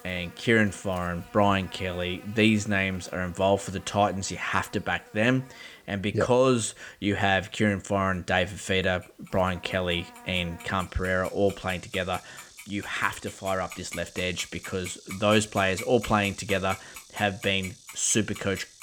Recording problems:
household noises; noticeable; throughout; 15 dB below the speech
animal sounds; faint; throughout; 20 dB below the speech

